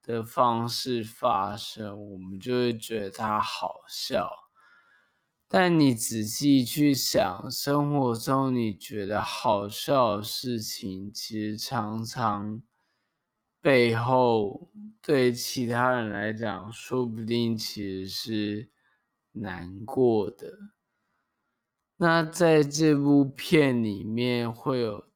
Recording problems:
wrong speed, natural pitch; too slow; 0.5 times normal speed

